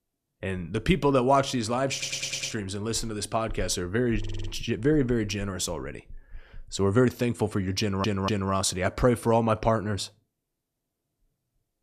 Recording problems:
audio stuttering; at 2 s, at 4 s and at 8 s

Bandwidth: 14.5 kHz